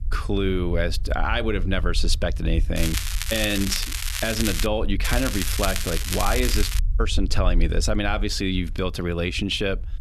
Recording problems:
crackling; loud; from 3 to 4.5 s and from 5 to 7 s; 3 dB below the speech
low rumble; faint; throughout; 25 dB below the speech

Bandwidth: 13.5 kHz